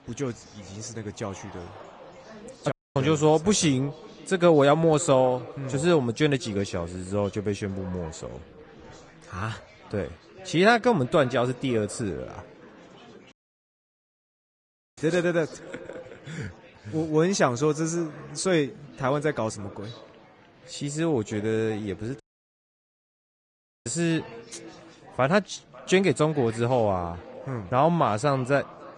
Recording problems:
echo of what is said; faint; throughout; 550 ms later, 20 dB below the speech
garbled, watery; slightly
chatter from many people; faint; throughout; 25 dB below the speech
audio cutting out; at 2.5 s, at 13 s for 1.5 s and at 22 s for 1.5 s

